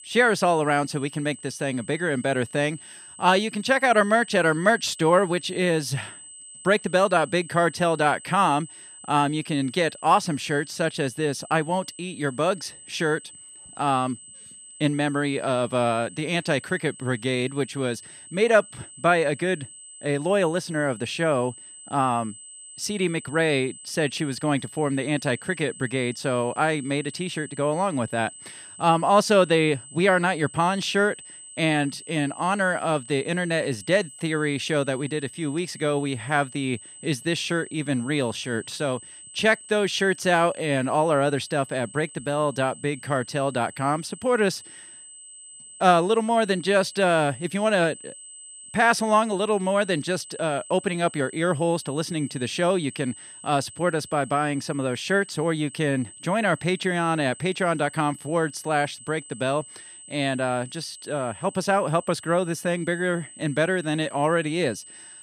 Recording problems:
high-pitched whine; noticeable; throughout; 8 kHz, 15 dB below the speech

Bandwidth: 14.5 kHz